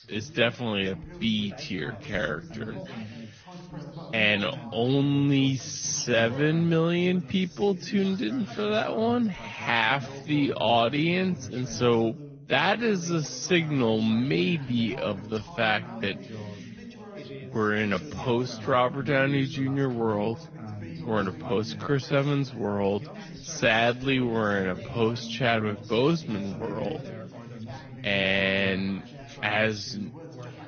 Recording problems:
wrong speed, natural pitch; too slow; 0.6 times normal speed
garbled, watery; slightly; nothing above 6.5 kHz
background chatter; noticeable; throughout; 3 voices, 15 dB below the speech

